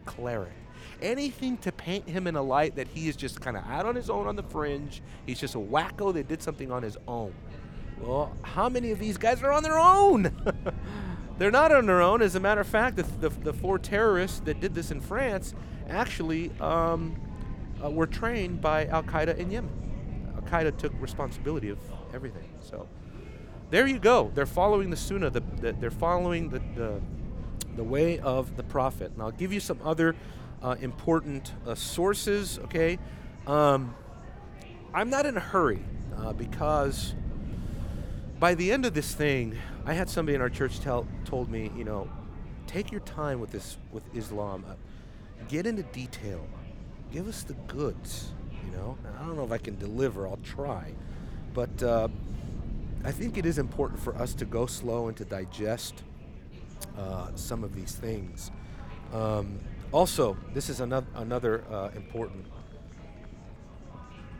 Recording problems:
wind noise on the microphone; occasional gusts; 25 dB below the speech
murmuring crowd; faint; throughout; 25 dB below the speech

